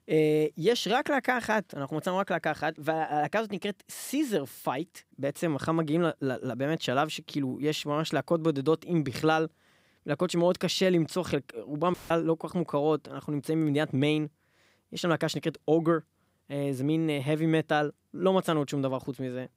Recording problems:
audio cutting out; filled with static; at 12 s

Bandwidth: 15.5 kHz